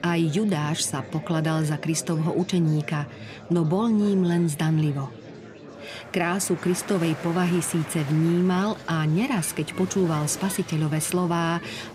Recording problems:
murmuring crowd; noticeable; throughout; 15 dB below the speech

